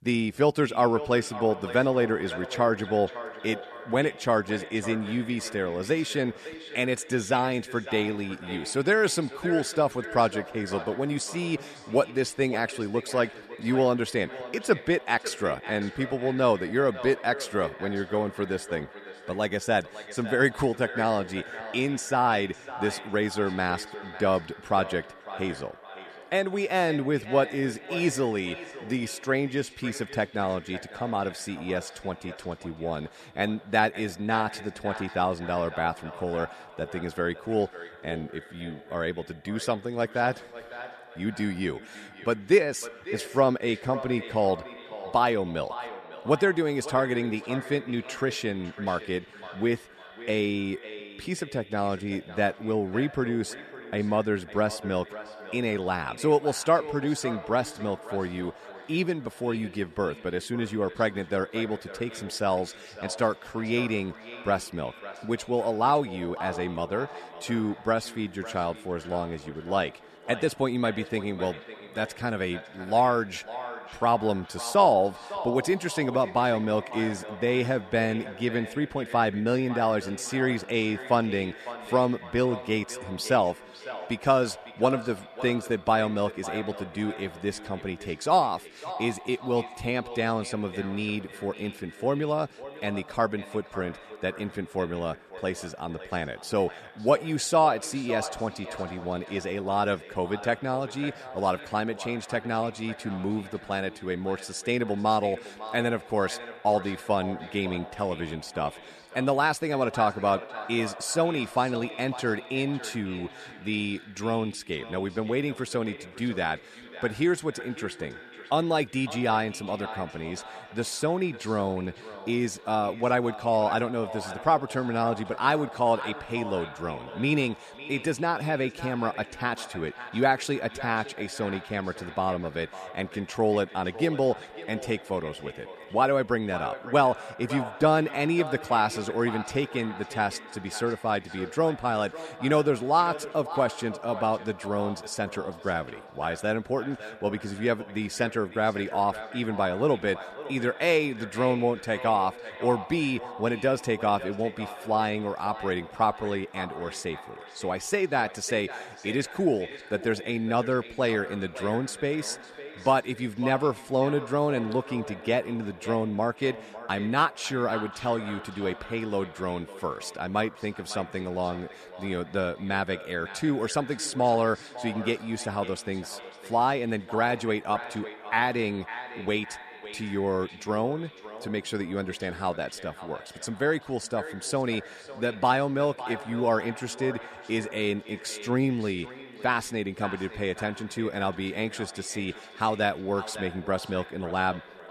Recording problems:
echo of what is said; noticeable; throughout; 550 ms later, 15 dB below the speech

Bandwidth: 13.5 kHz